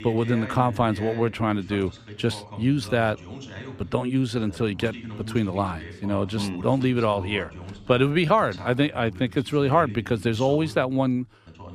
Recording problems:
voice in the background; noticeable; throughout; 15 dB below the speech

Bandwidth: 14.5 kHz